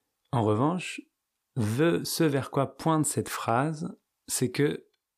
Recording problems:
none

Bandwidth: 15 kHz